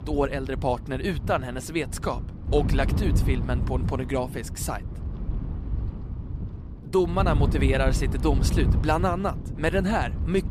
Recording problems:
wind noise on the microphone; occasional gusts; 10 dB below the speech

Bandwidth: 14.5 kHz